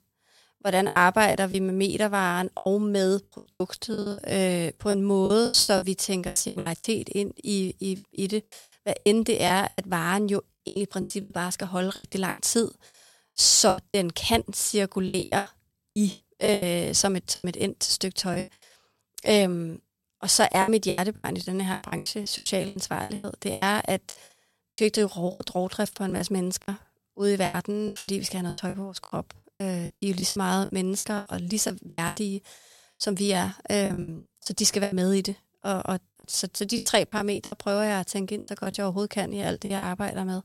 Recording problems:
choppy; very; 15% of the speech affected

